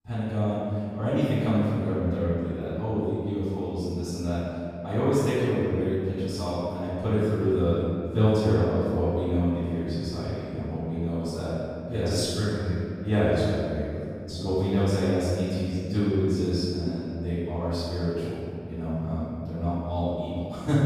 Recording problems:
room echo; strong; dies away in 2.2 s
off-mic speech; far

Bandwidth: 15.5 kHz